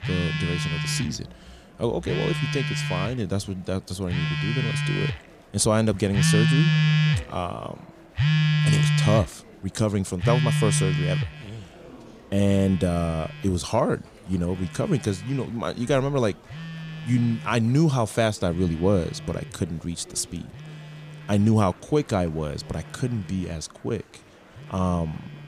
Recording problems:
alarms or sirens; very loud; throughout; 1 dB above the speech
murmuring crowd; faint; throughout; 25 dB below the speech

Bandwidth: 15 kHz